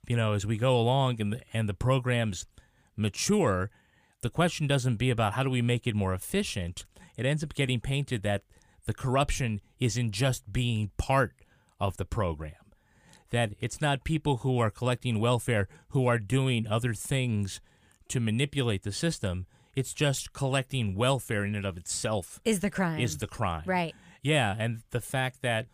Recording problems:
none

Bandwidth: 15 kHz